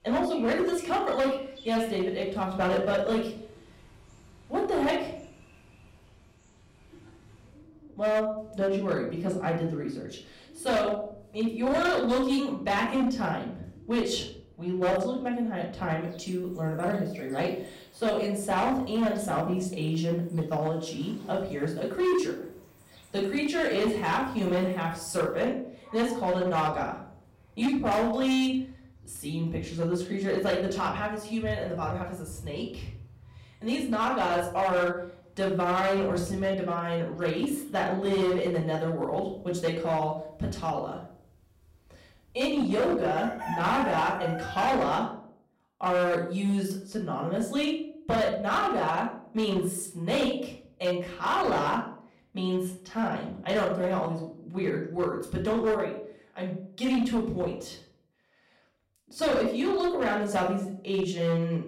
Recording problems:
off-mic speech; far
room echo; slight; dies away in 0.5 s
distortion; slight; 7% of the sound clipped
animal sounds; noticeable; until 45 s; 15 dB below the speech

